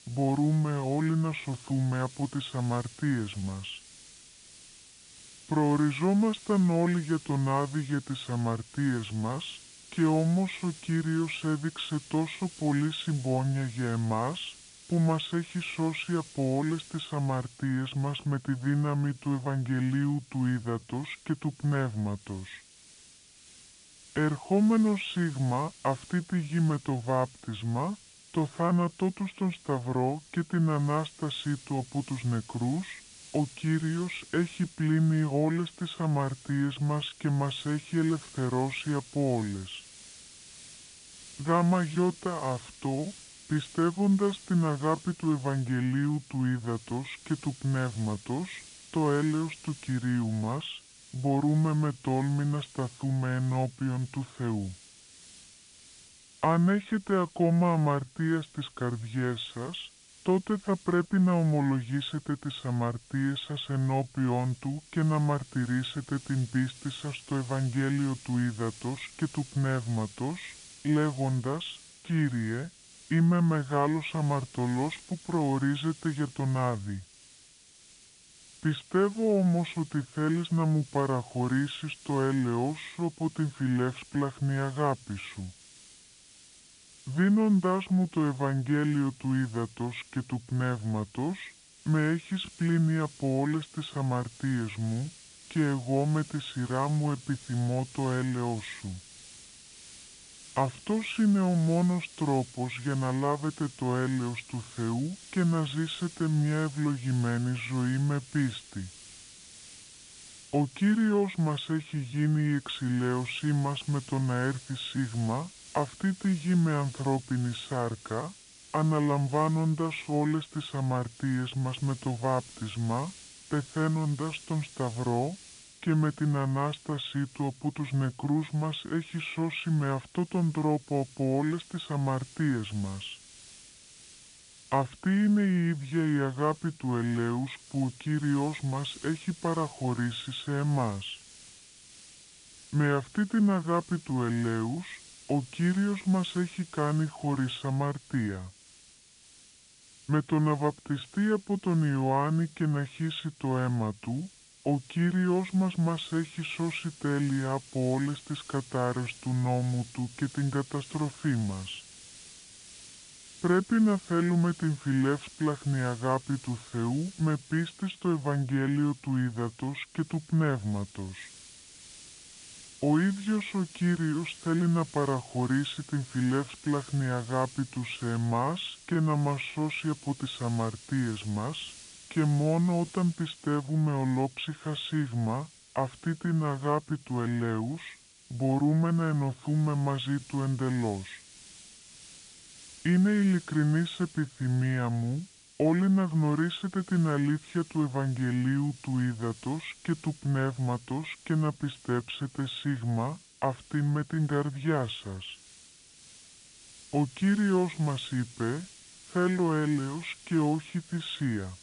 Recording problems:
high frequencies cut off; severe; nothing above 4 kHz
wrong speed and pitch; too slow and too low; 0.7 times normal speed
hiss; noticeable; throughout; 20 dB below the speech

